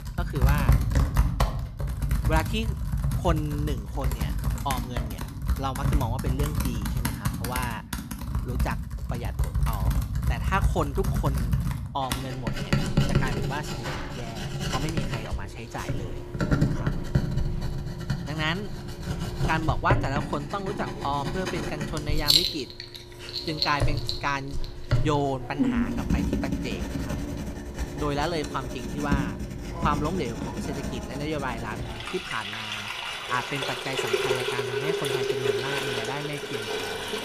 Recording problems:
household noises; very loud; throughout; 3 dB above the speech

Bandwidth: 14.5 kHz